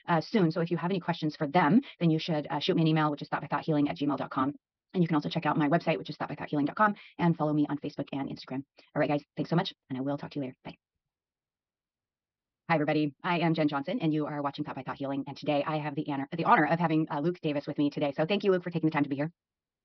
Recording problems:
wrong speed, natural pitch; too fast; 1.6 times normal speed
high frequencies cut off; noticeable; nothing above 5.5 kHz

